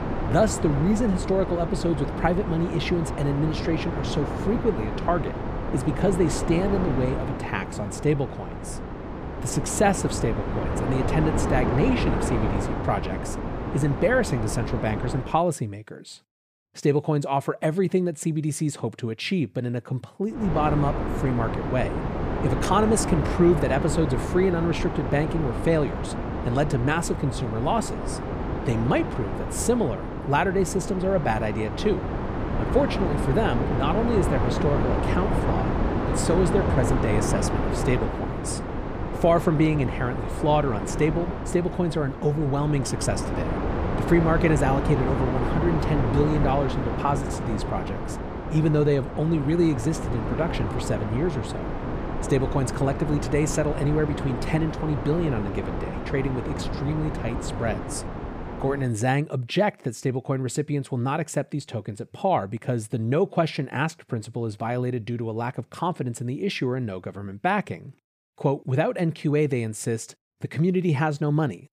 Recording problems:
wind noise on the microphone; heavy; until 15 s and from 20 to 59 s; 4 dB below the speech

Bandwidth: 15 kHz